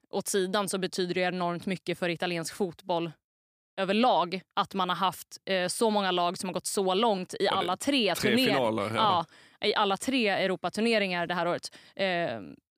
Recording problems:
none

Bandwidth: 15 kHz